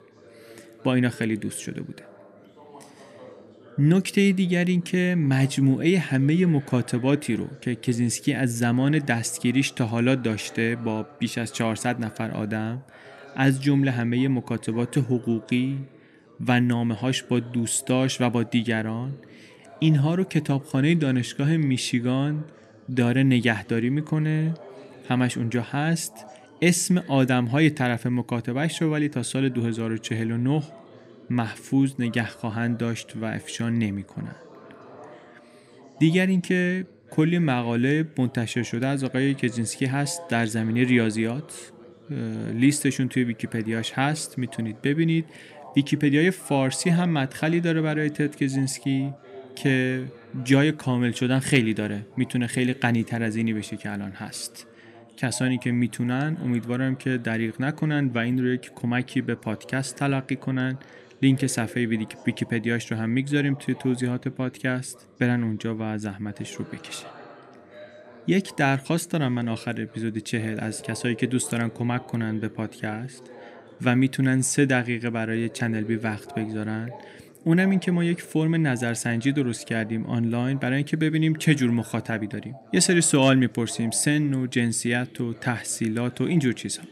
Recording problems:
background chatter; faint; throughout; 3 voices, 20 dB below the speech

